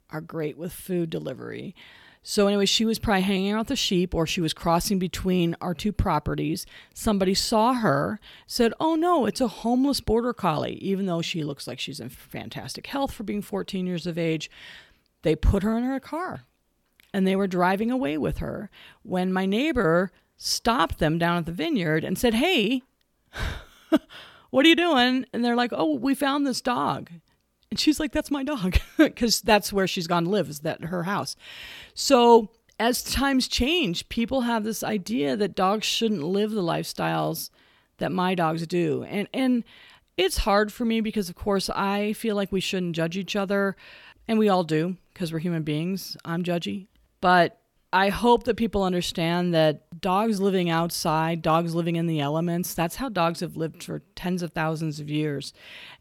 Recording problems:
none

